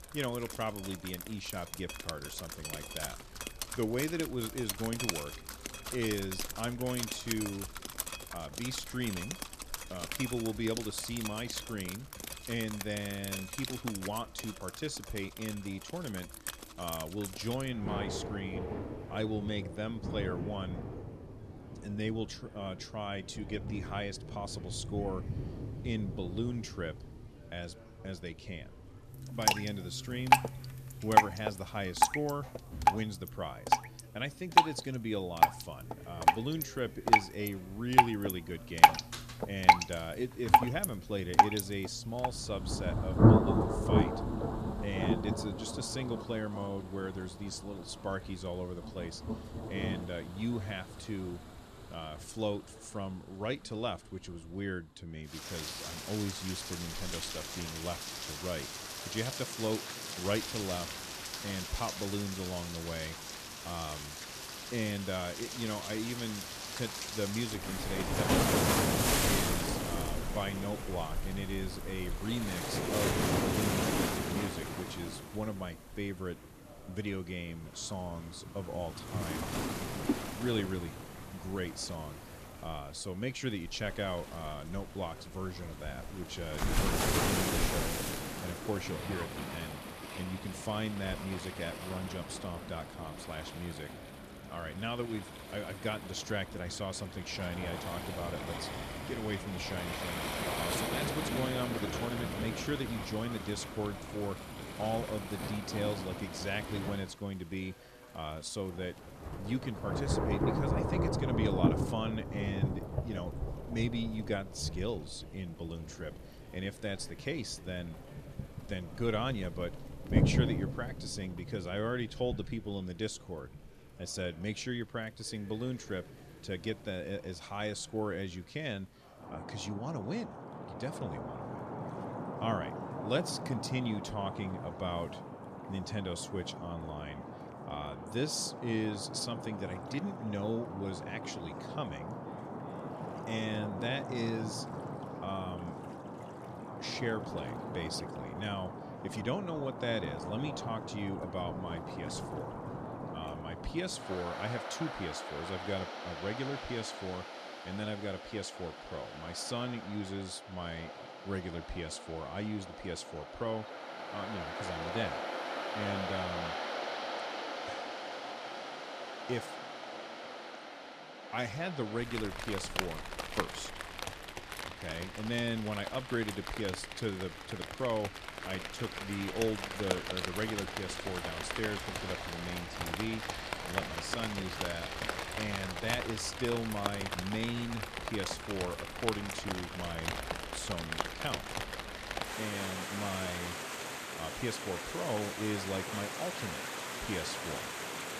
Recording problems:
rain or running water; very loud; throughout; 3 dB above the speech
background chatter; faint; throughout; 4 voices, 20 dB below the speech

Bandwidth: 14.5 kHz